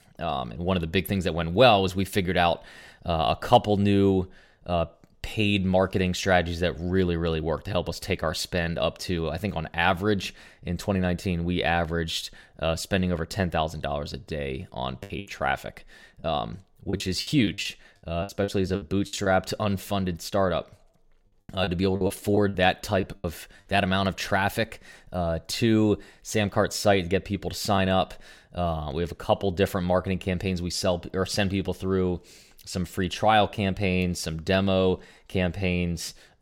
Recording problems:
choppy; very; from 15 to 19 s and from 21 to 24 s; 13% of the speech affected

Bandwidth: 16.5 kHz